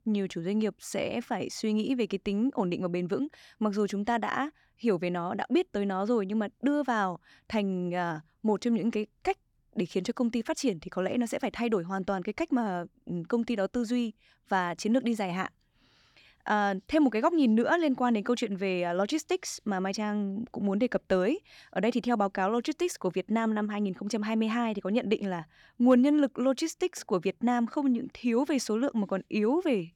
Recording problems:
none

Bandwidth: 18.5 kHz